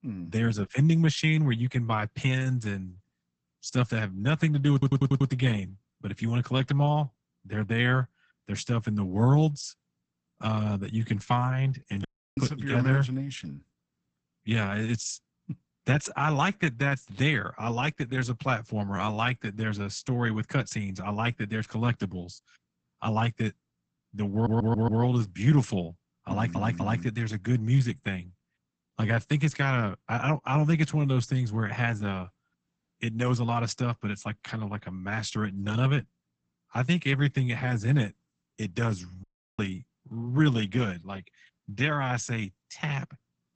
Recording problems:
garbled, watery; badly; nothing above 8 kHz
audio stuttering; at 4.5 s, at 24 s and at 26 s
audio cutting out; at 12 s and at 39 s

